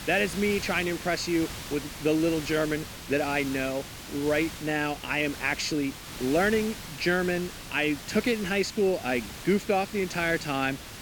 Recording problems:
hiss; noticeable; throughout; 10 dB below the speech

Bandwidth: 18 kHz